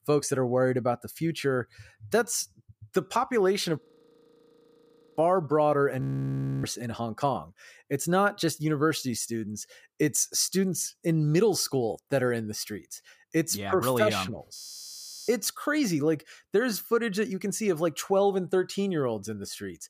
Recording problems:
audio freezing; at 4 s for 1.5 s, at 6 s for 0.5 s and at 15 s for 0.5 s

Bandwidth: 15 kHz